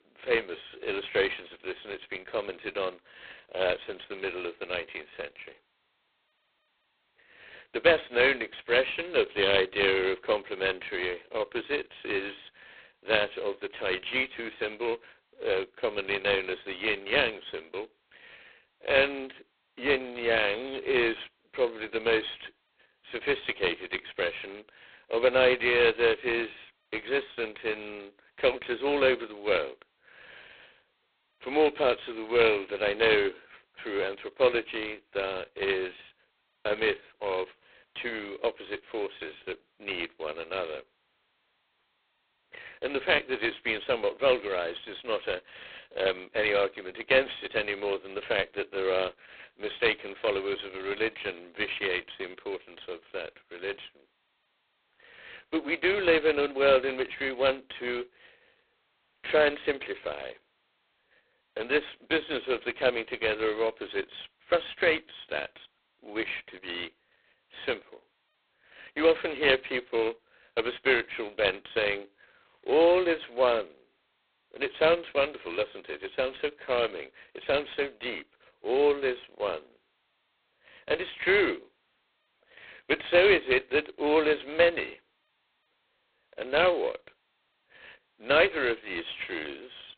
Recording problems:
phone-call audio; poor line; nothing above 4 kHz

